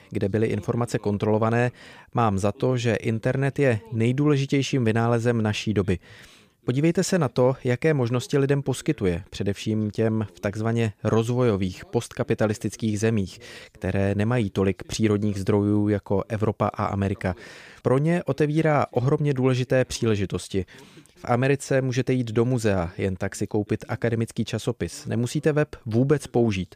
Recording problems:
none

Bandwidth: 15 kHz